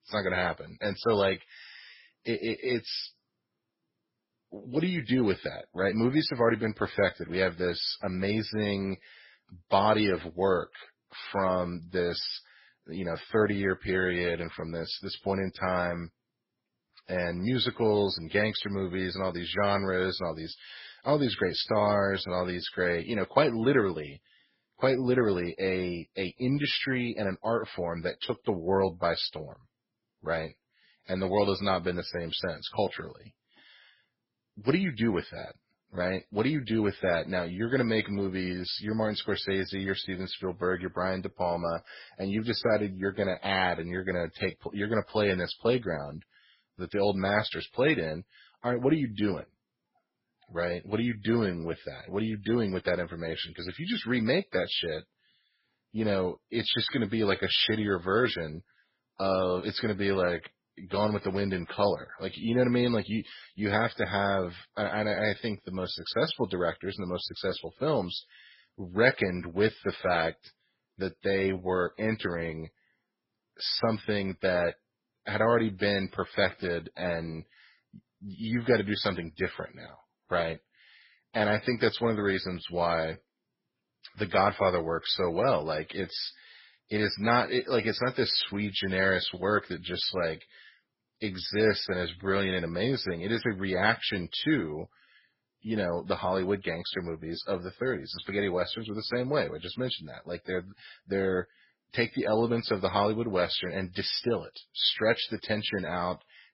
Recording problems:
garbled, watery; badly; nothing above 5.5 kHz

